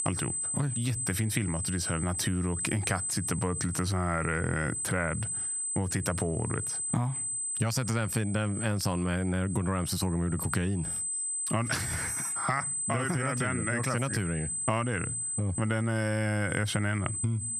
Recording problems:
squashed, flat; heavily
high-pitched whine; loud; throughout; 8 kHz, 3 dB below the speech

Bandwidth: 14.5 kHz